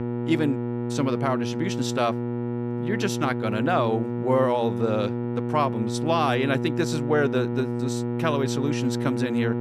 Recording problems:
electrical hum; loud; throughout; 60 Hz, 6 dB below the speech

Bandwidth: 14.5 kHz